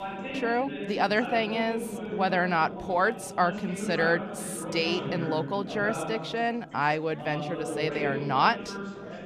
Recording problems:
background chatter; loud; throughout; 4 voices, 7 dB below the speech

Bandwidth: 14.5 kHz